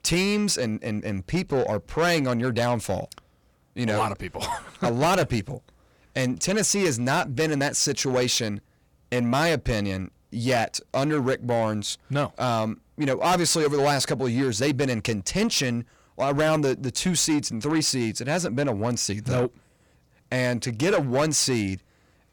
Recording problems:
distortion; slight; 10 dB below the speech

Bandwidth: 18.5 kHz